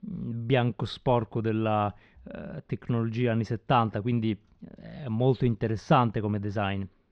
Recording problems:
muffled; slightly; fading above 4.5 kHz

